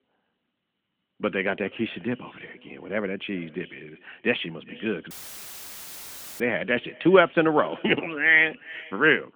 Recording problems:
echo of what is said; faint; throughout; 400 ms later, 20 dB below the speech
phone-call audio; nothing above 3.5 kHz
audio cutting out; filled with static; at 5 s for 1.5 s

